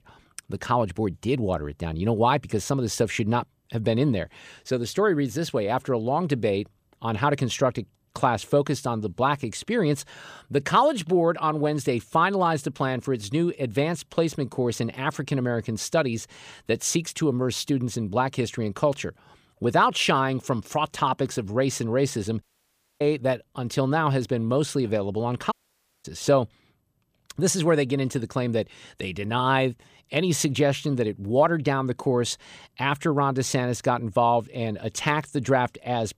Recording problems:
audio cutting out; at 22 s for 0.5 s and at 26 s for 0.5 s

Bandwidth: 15 kHz